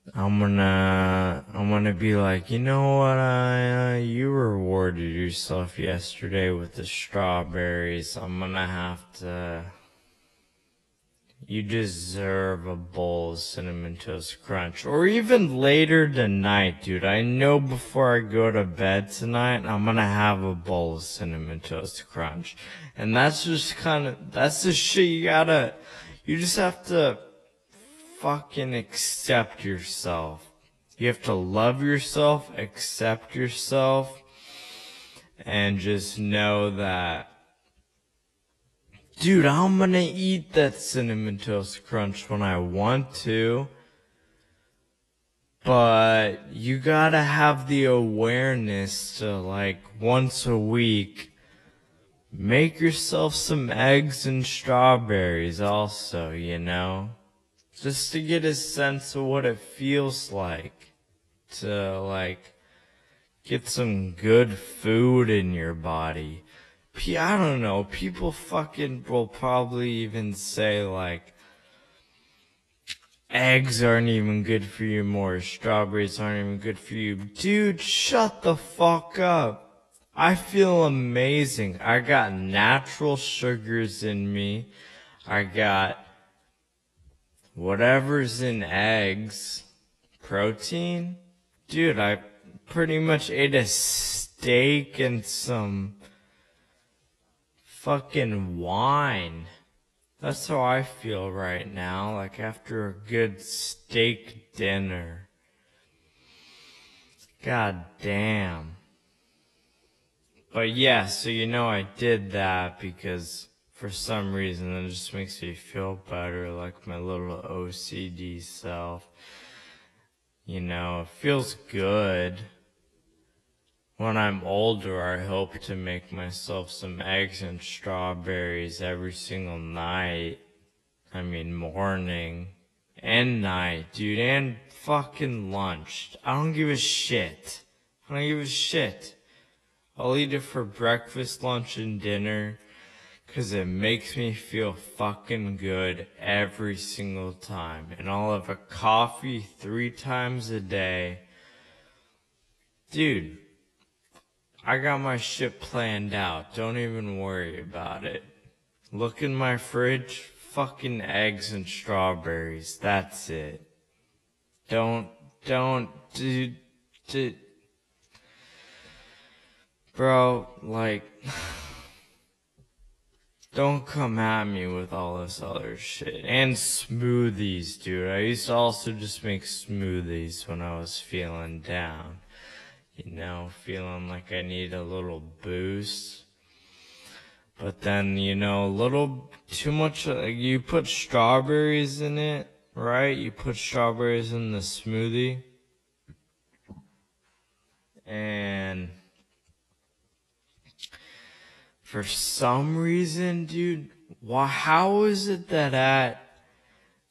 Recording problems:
wrong speed, natural pitch; too slow; 0.5 times normal speed
garbled, watery; slightly; nothing above 11.5 kHz

